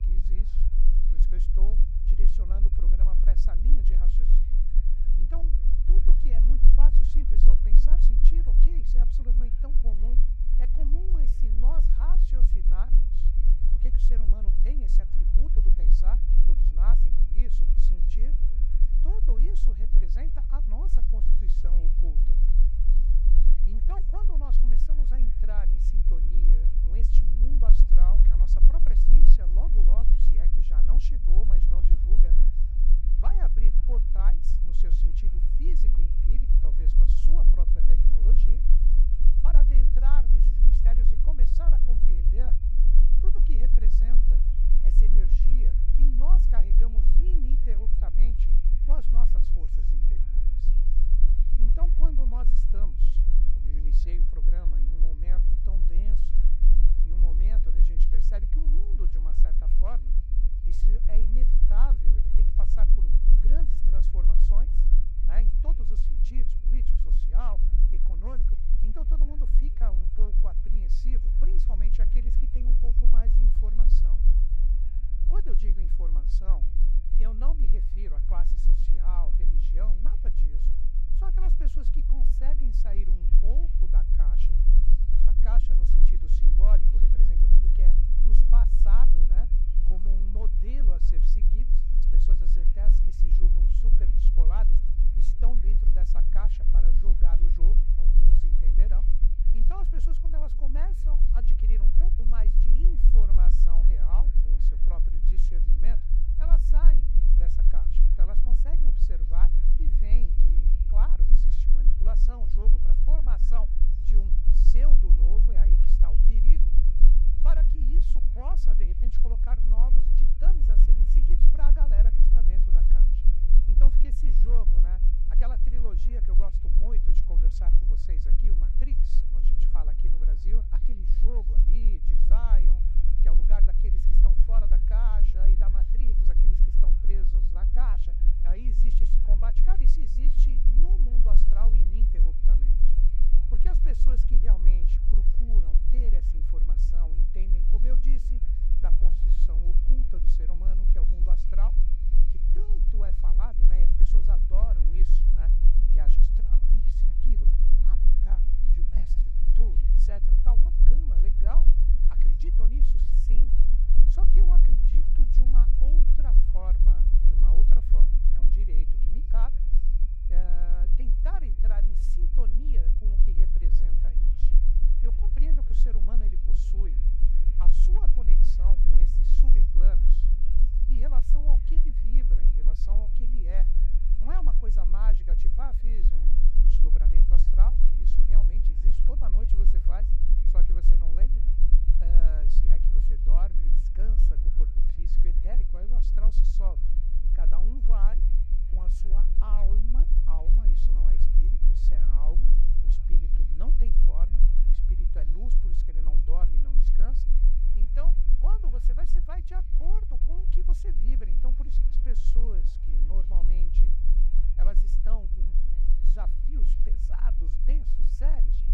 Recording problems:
low rumble; loud; throughout; 4 dB below the speech
high-pitched whine; faint; throughout; 2.5 kHz, 30 dB below the speech
background chatter; faint; throughout; 3 voices, 20 dB below the speech

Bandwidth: 17.5 kHz